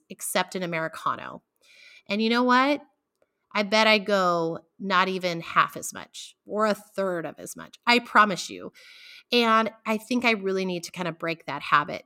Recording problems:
none

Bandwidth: 16.5 kHz